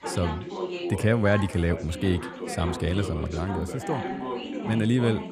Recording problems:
background chatter; loud; throughout; 3 voices, 7 dB below the speech

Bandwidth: 15 kHz